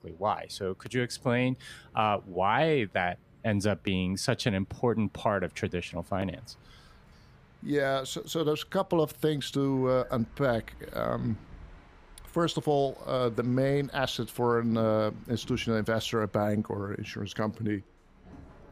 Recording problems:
train or aircraft noise; faint; throughout; 25 dB below the speech

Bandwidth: 15 kHz